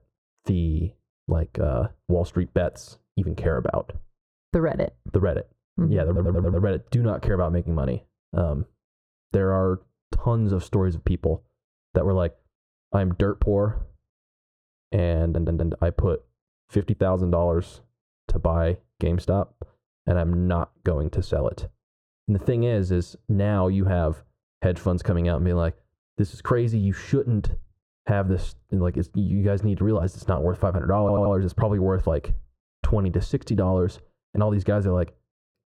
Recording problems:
muffled; very; fading above 2.5 kHz
squashed, flat; somewhat
audio stuttering; at 6 s, at 15 s and at 31 s

